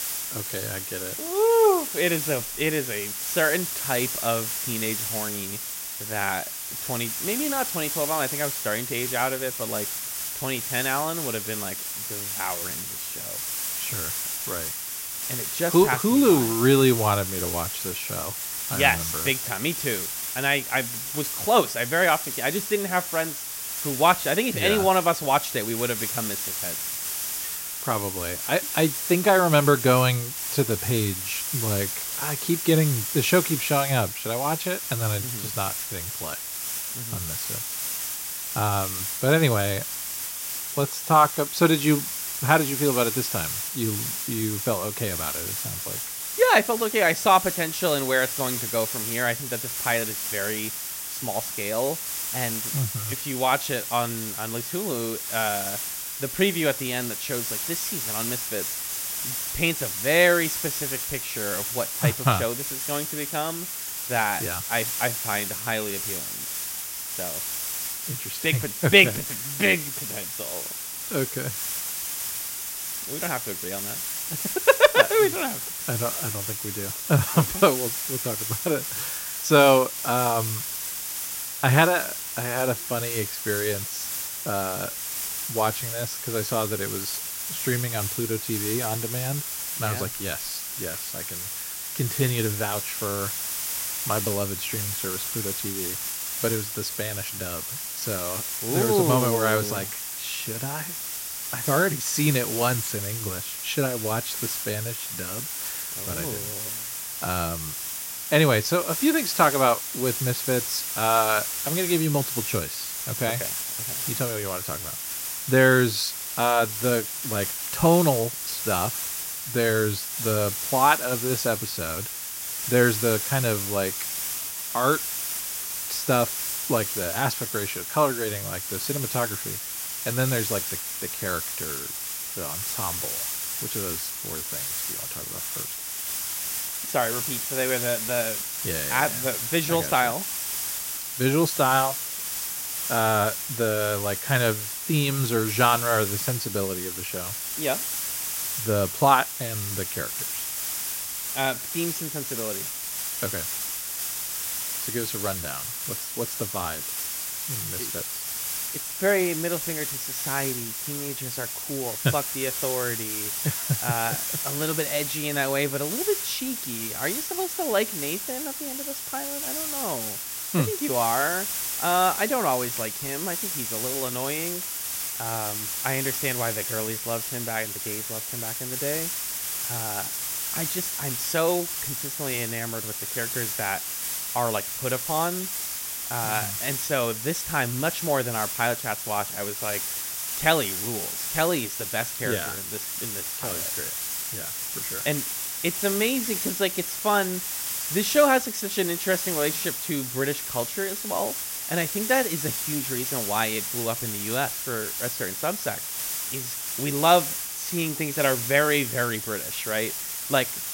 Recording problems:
hiss; loud; throughout; 2 dB below the speech

